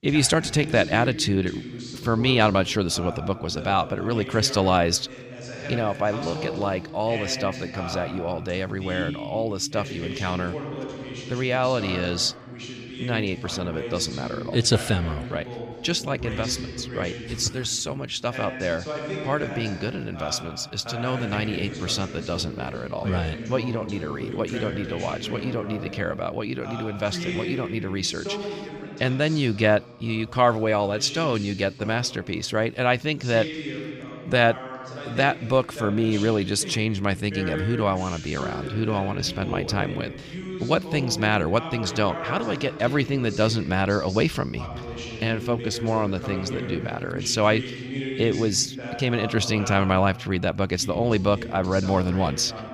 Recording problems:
voice in the background; loud; throughout; 10 dB below the speech

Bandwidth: 15 kHz